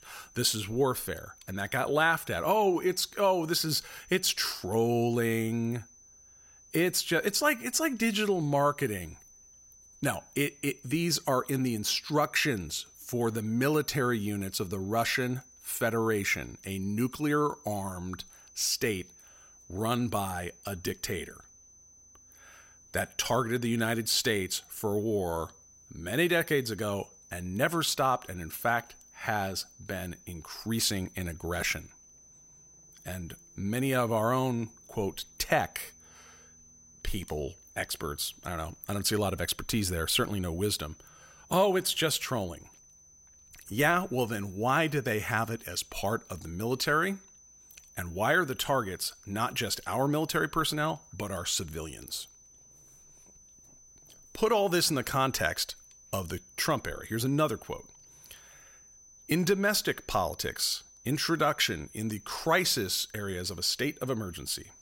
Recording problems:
high-pitched whine; faint; throughout; 6 kHz, 25 dB below the speech

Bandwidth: 16 kHz